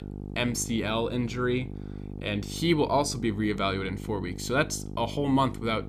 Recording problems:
electrical hum; noticeable; throughout; 50 Hz, 15 dB below the speech

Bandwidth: 14.5 kHz